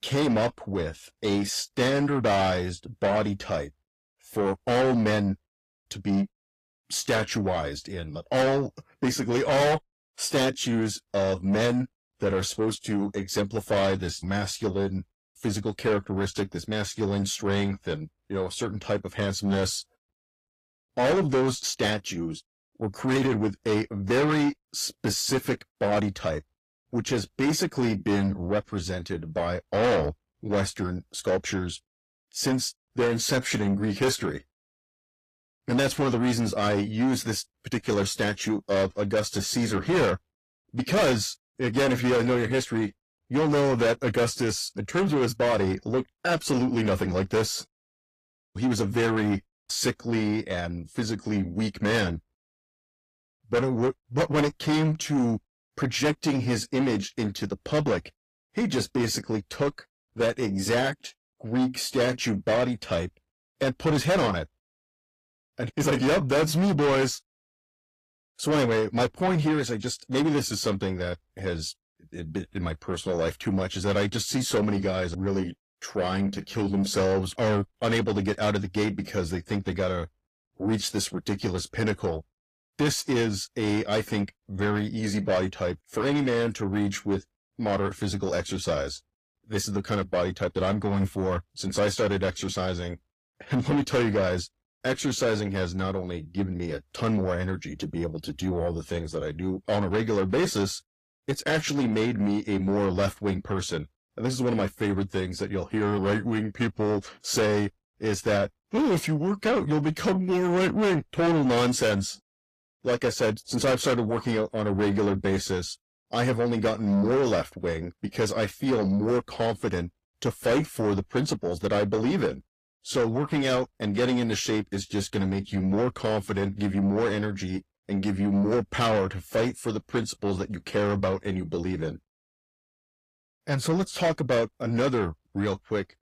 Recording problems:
distortion; heavy; 6 dB below the speech
garbled, watery; slightly; nothing above 15.5 kHz

